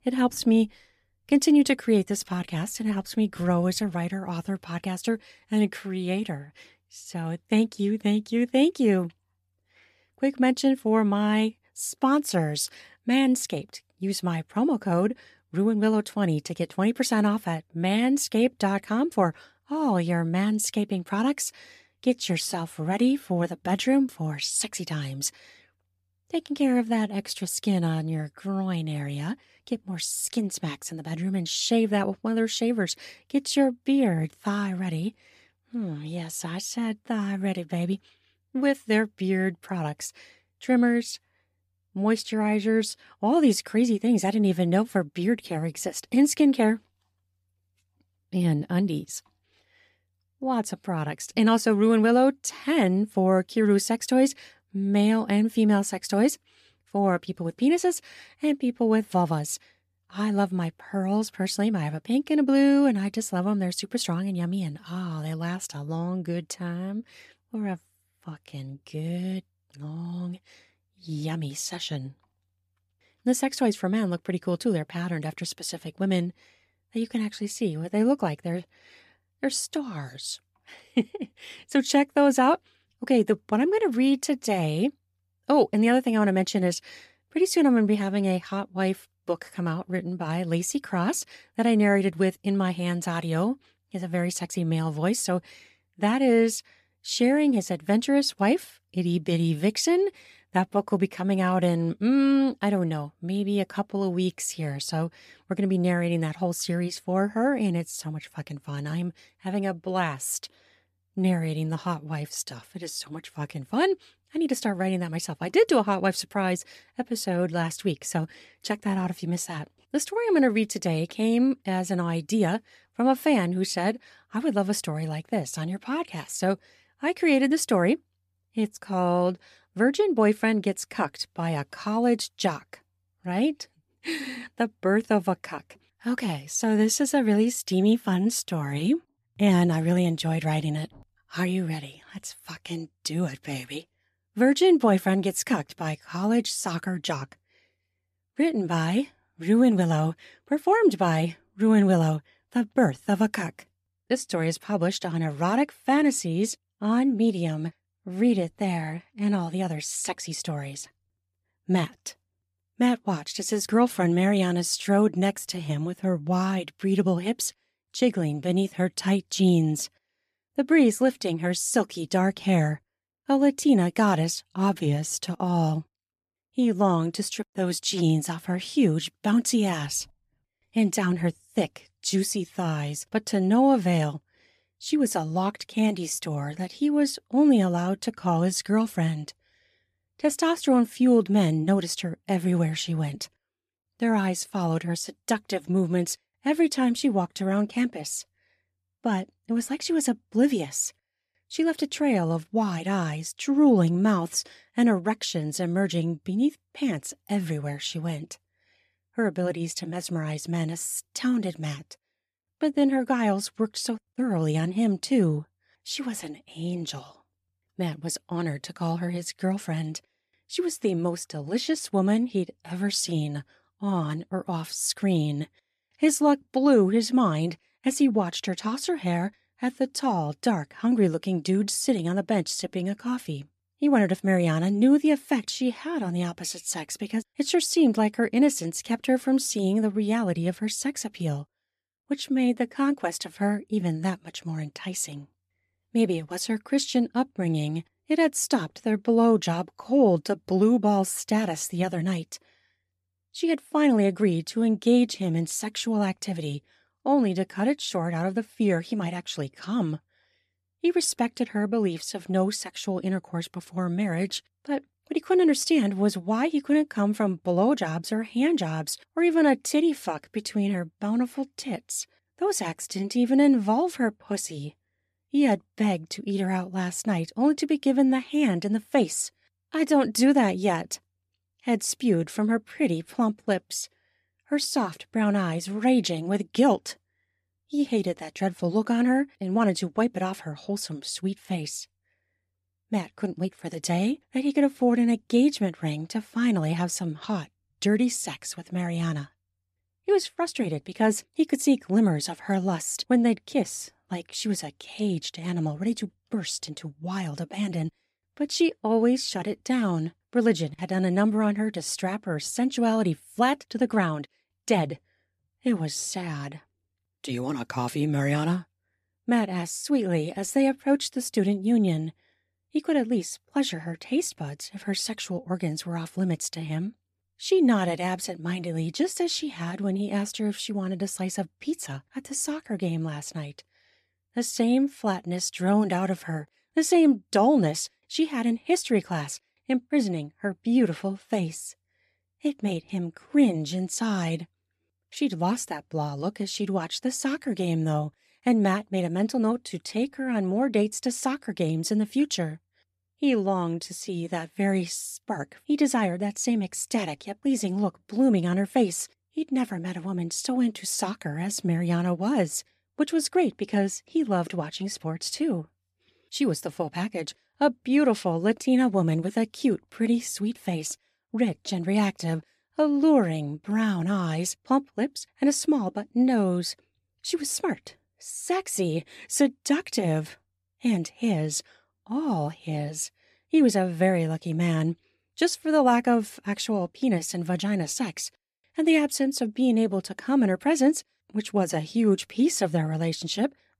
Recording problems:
none

